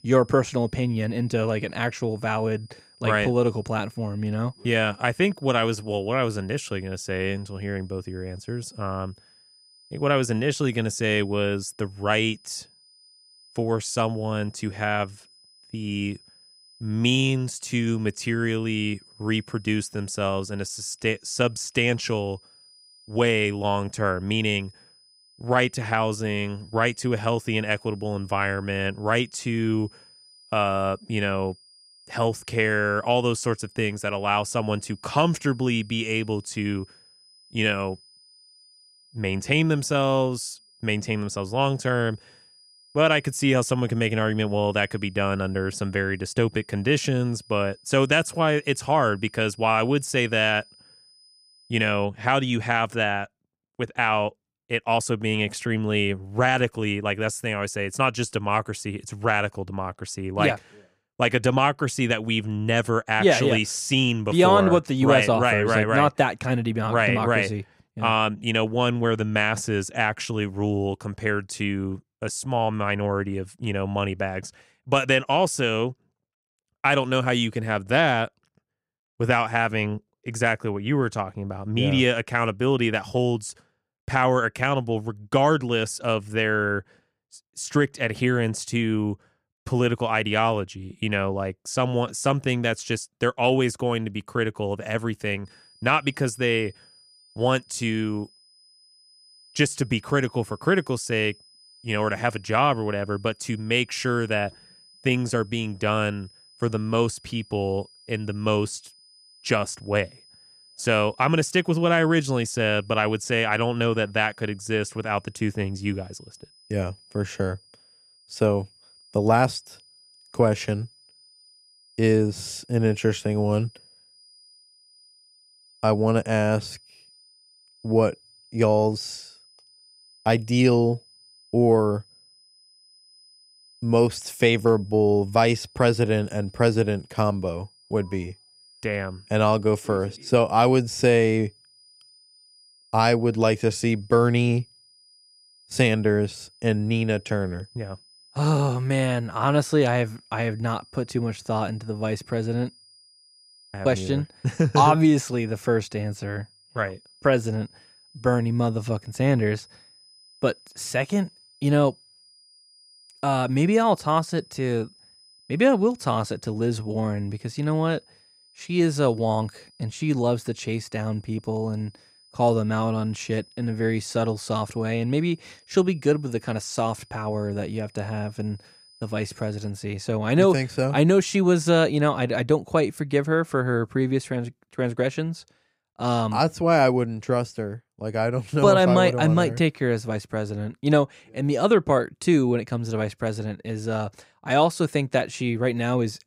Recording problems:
high-pitched whine; faint; until 52 s and from 1:35 to 3:00; 5 kHz, 30 dB below the speech

